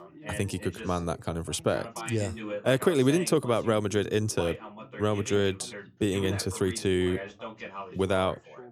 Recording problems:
background chatter; noticeable; throughout; 2 voices, 15 dB below the speech

